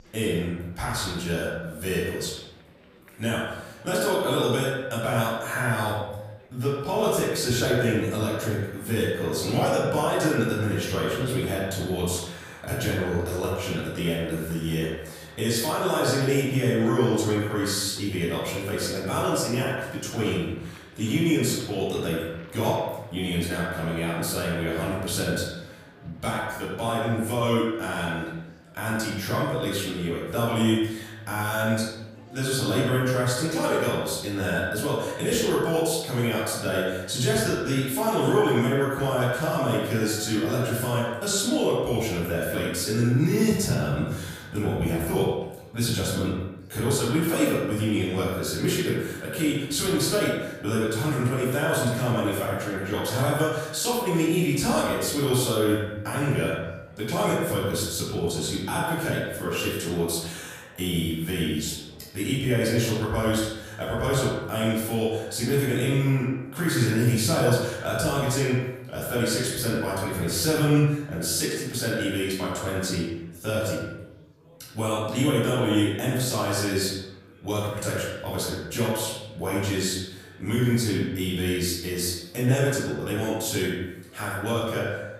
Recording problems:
echo of what is said; strong; throughout; 80 ms later, 6 dB below the speech
off-mic speech; far
room echo; noticeable; dies away in 0.7 s
chatter from many people; faint; throughout; 25 dB below the speech

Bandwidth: 15 kHz